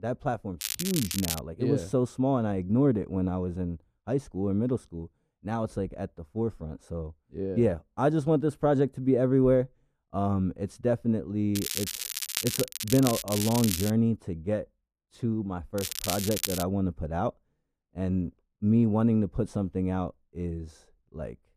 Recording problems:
muffled; very; fading above 2 kHz
crackling; loud; 4 times, first at 0.5 s; 4 dB below the speech

